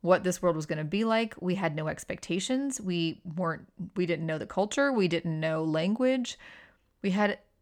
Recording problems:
none

